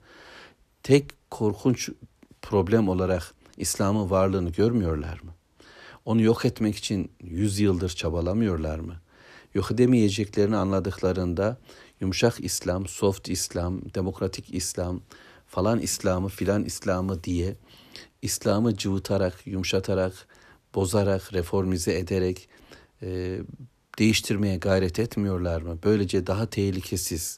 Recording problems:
none

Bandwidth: 14.5 kHz